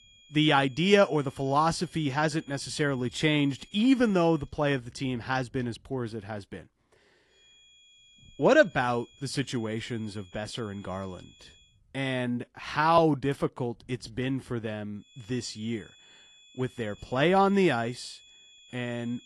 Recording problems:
garbled, watery; slightly
high-pitched whine; faint; until 4.5 s, from 7.5 to 12 s and from 15 s on; 3.5 kHz, 25 dB below the speech

